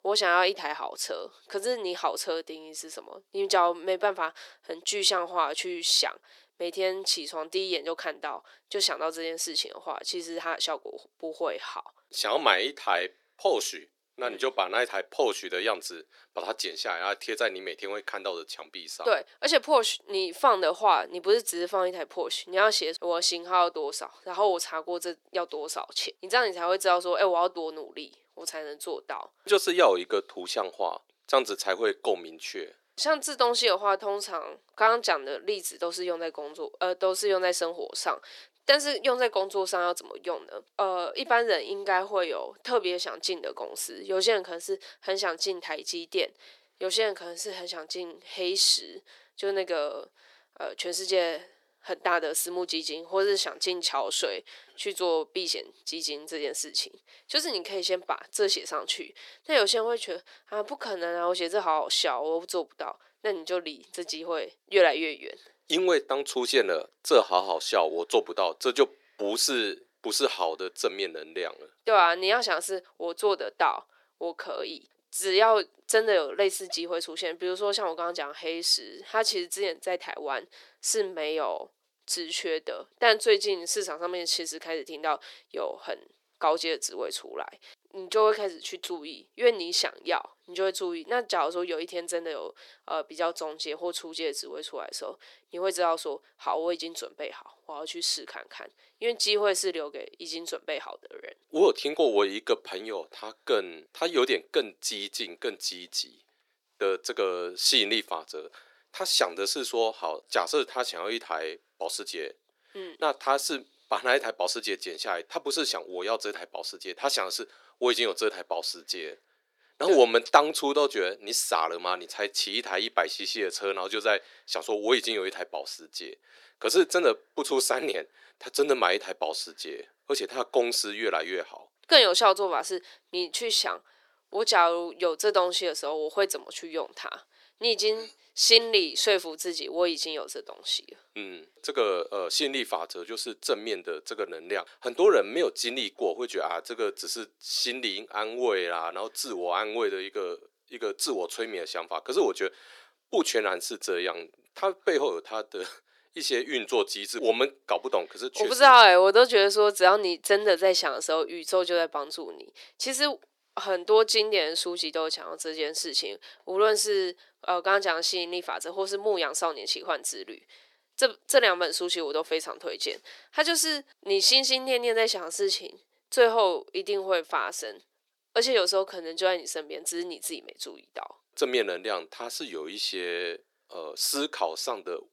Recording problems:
thin; very; fading below 350 Hz

